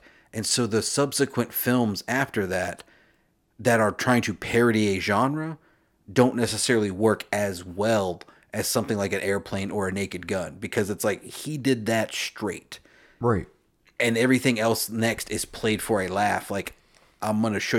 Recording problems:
abrupt cut into speech; at the end

